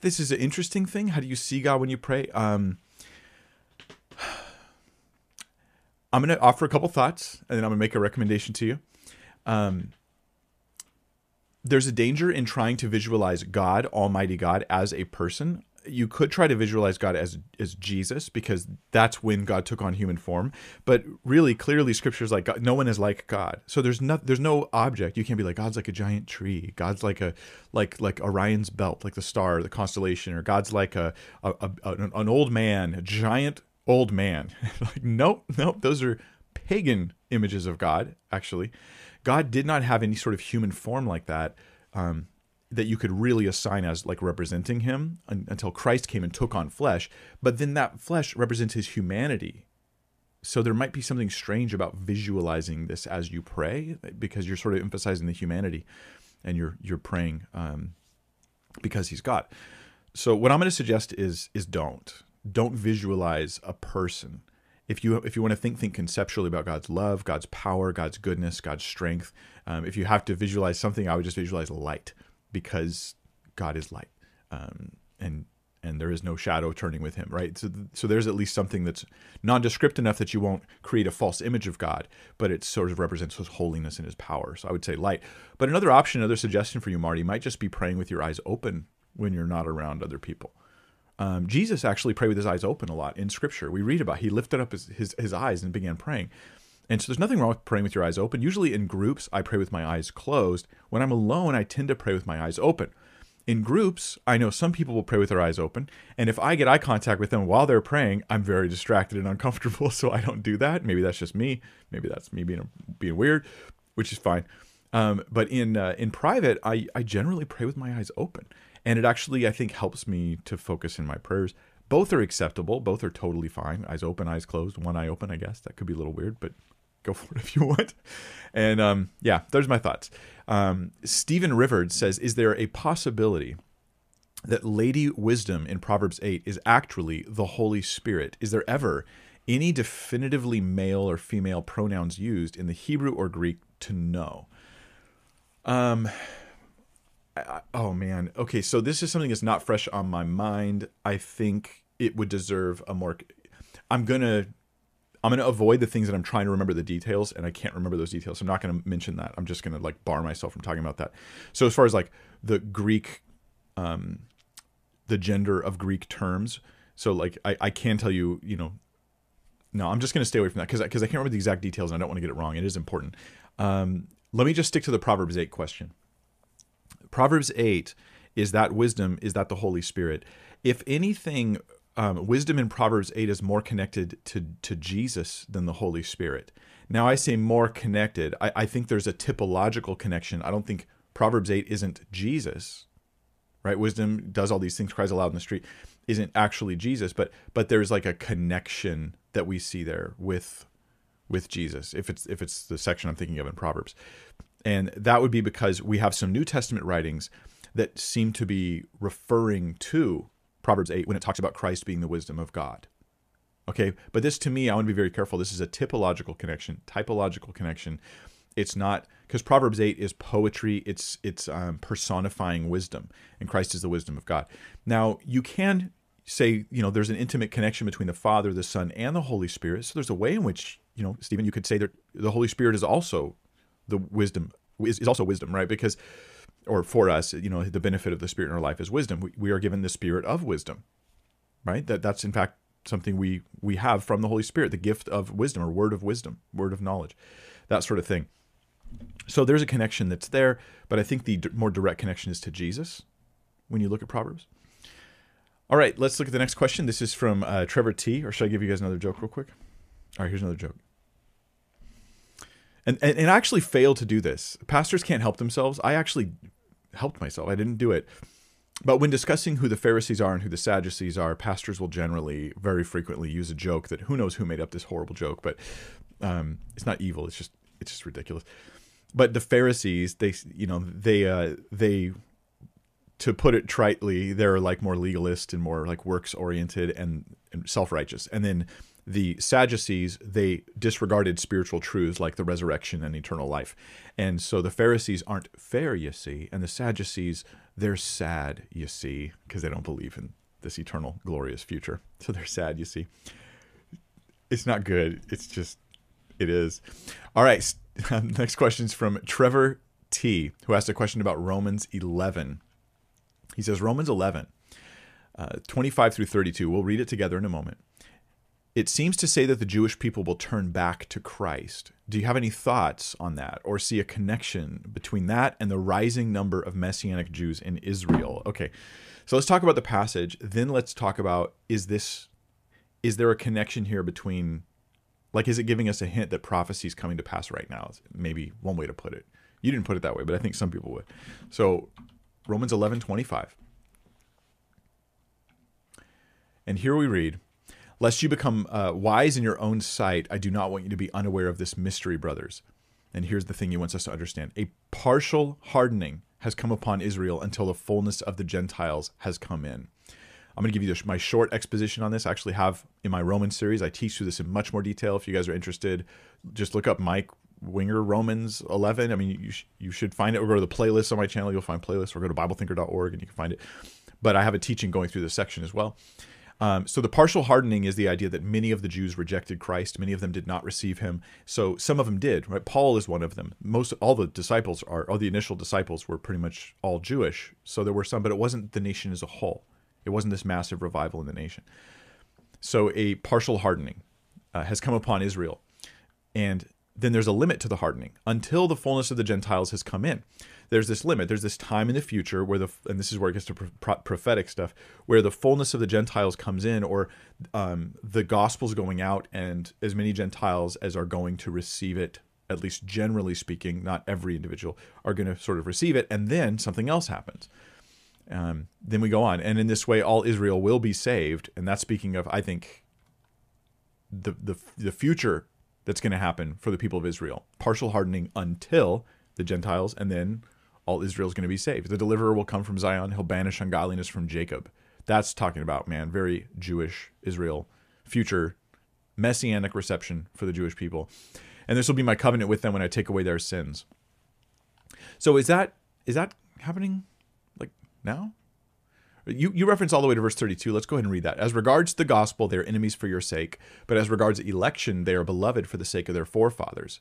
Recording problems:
uneven, jittery; strongly; from 1:29 to 3:55

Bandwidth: 14.5 kHz